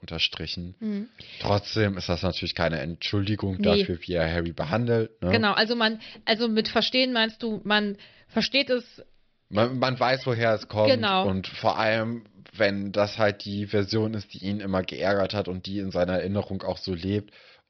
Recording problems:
high frequencies cut off; noticeable; nothing above 5.5 kHz

